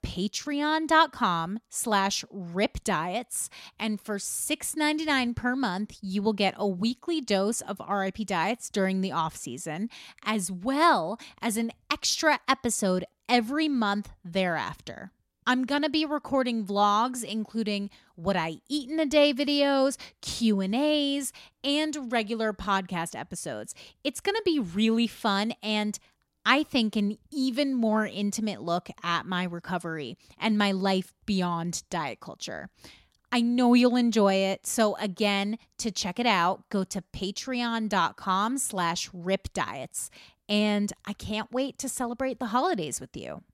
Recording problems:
none

